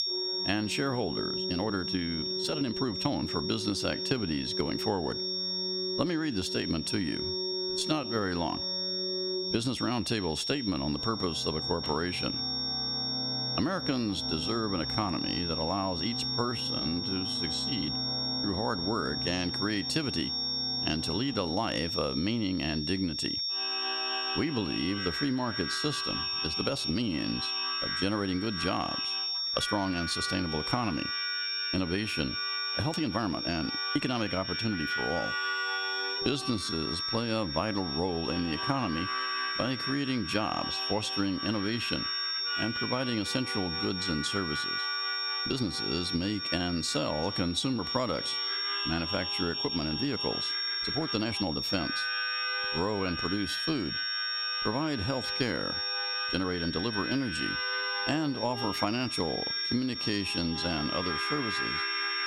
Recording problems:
squashed, flat; somewhat
high-pitched whine; loud; throughout; 5.5 kHz, 1 dB below the speech
background music; loud; throughout; 6 dB below the speech
uneven, jittery; strongly; from 1.5 s to 1:00

